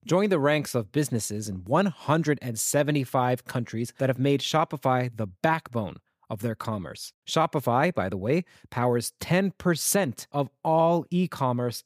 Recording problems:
none

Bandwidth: 15 kHz